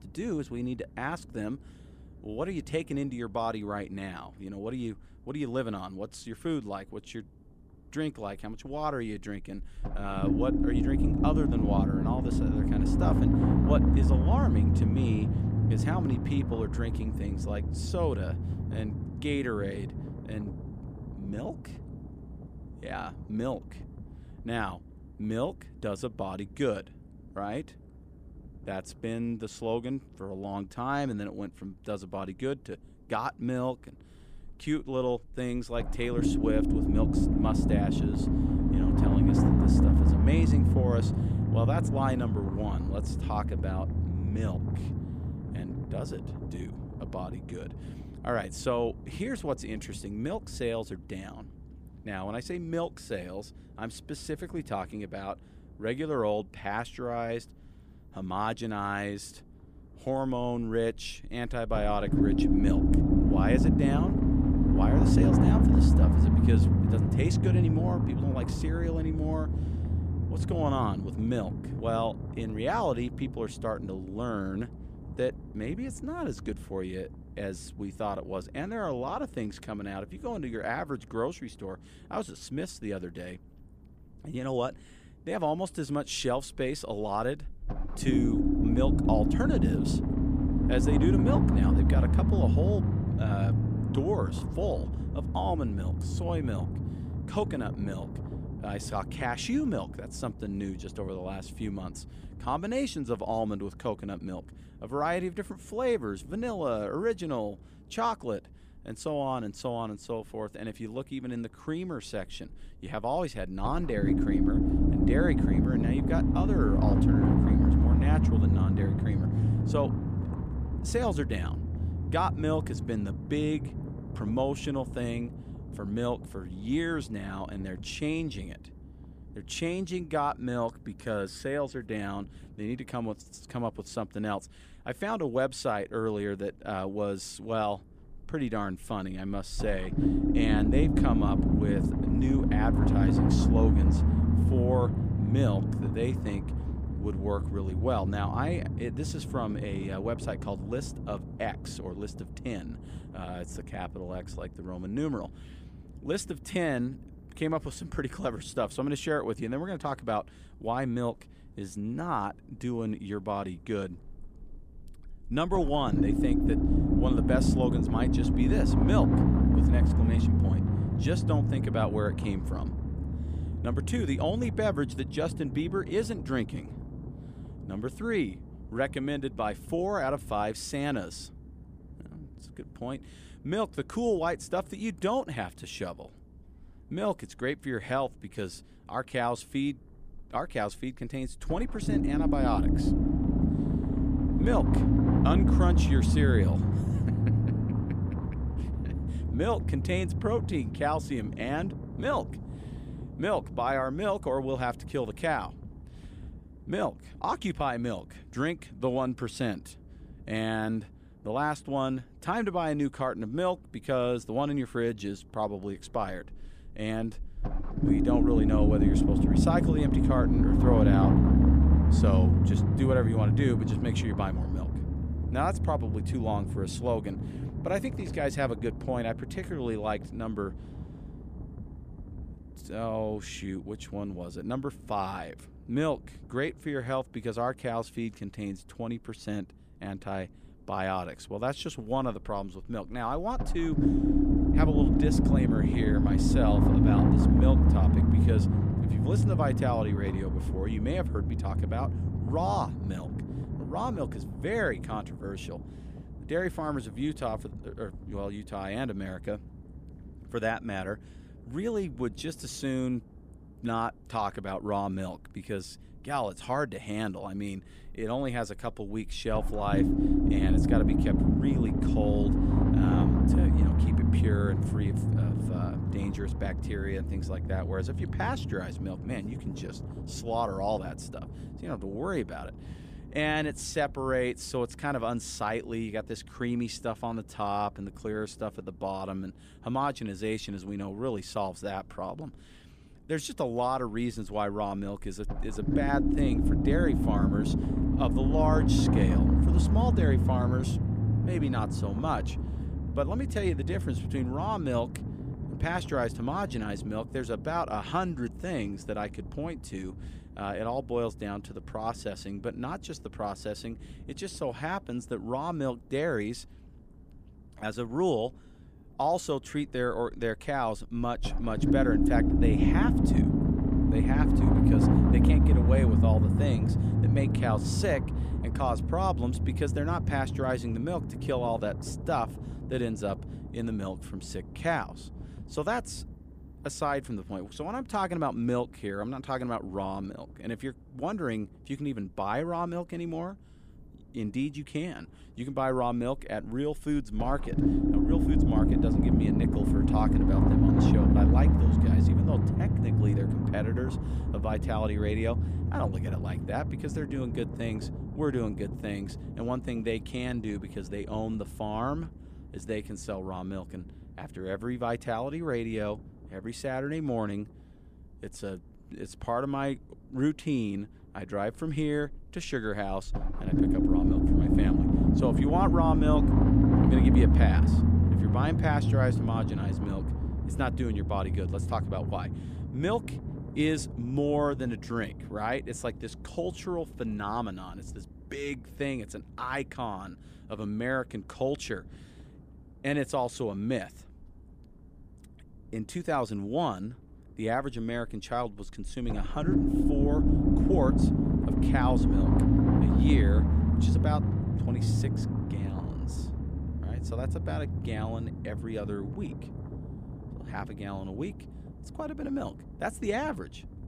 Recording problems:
low rumble; loud; throughout; 1 dB below the speech

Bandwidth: 15 kHz